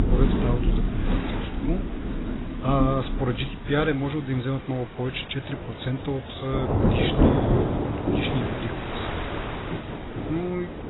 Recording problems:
garbled, watery; badly; nothing above 4 kHz
rain or running water; very loud; throughout; 2 dB above the speech
wind noise on the microphone; heavy; 7 dB below the speech

